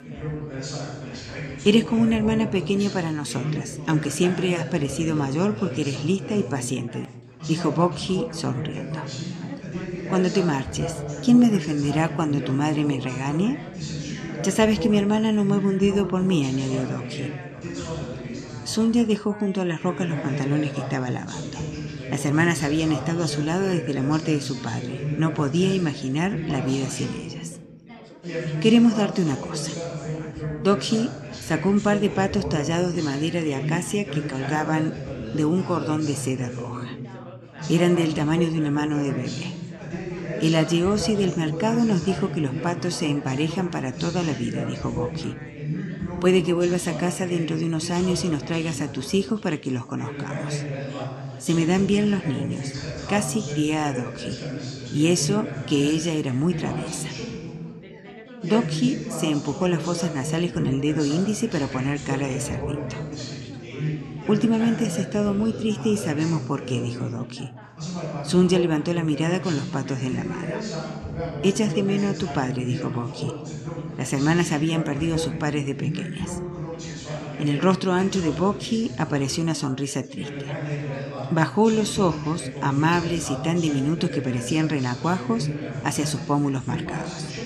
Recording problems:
background chatter; loud; throughout; 4 voices, 8 dB below the speech

